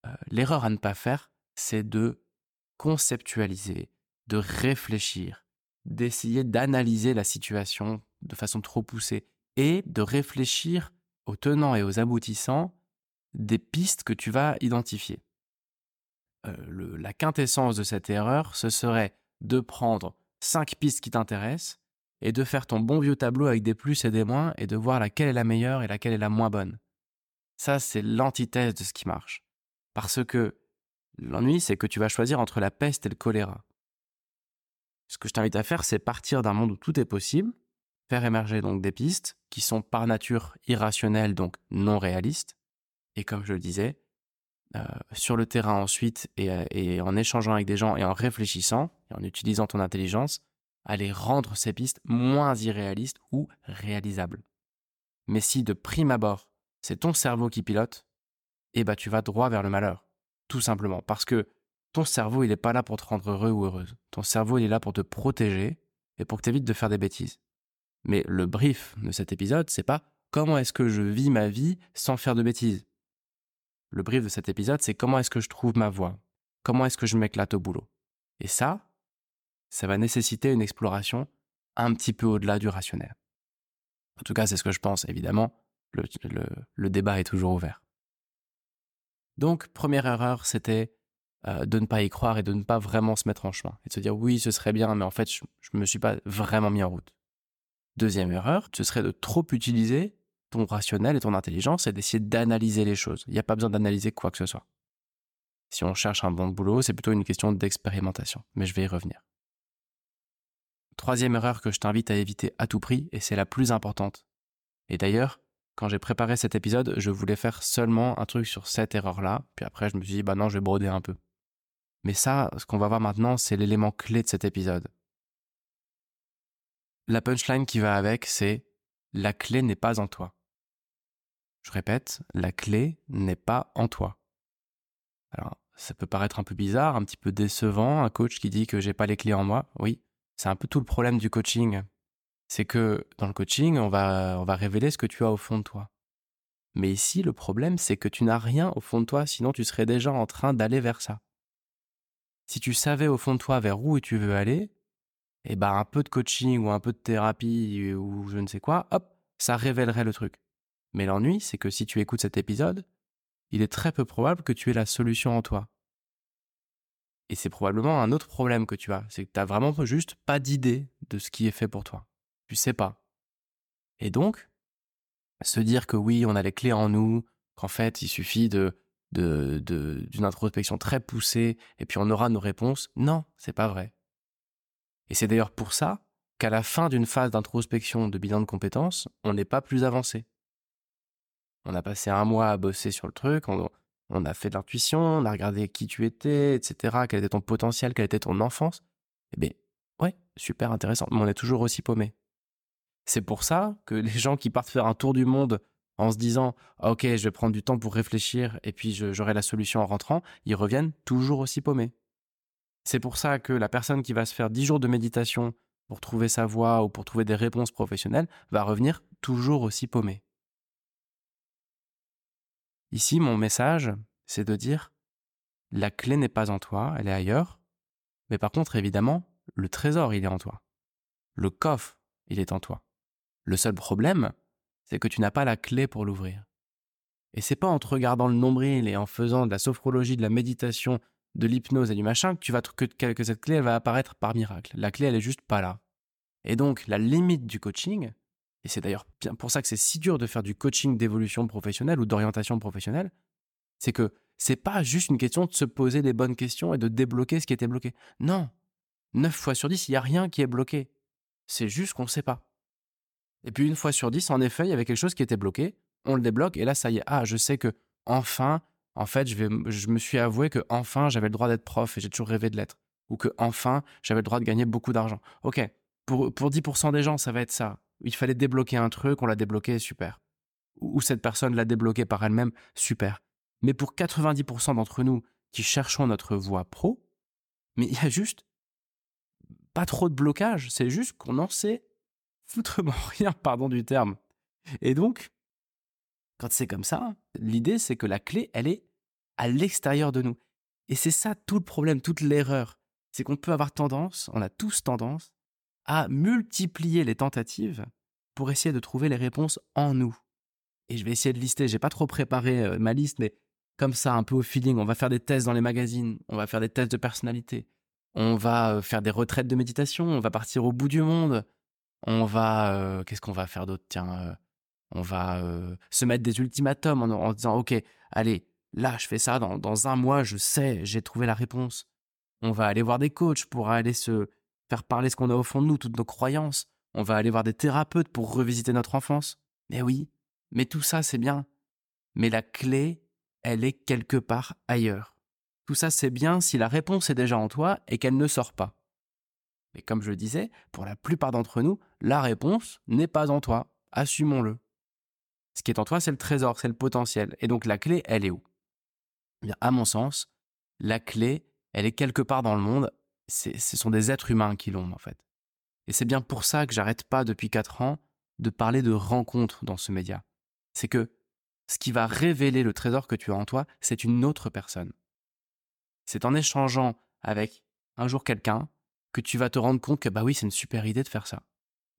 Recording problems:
none

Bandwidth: 18 kHz